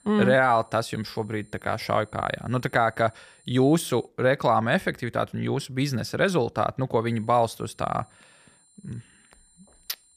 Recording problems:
high-pitched whine; faint; until 4 s and from 7 s on; 9 kHz, 30 dB below the speech

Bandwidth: 14.5 kHz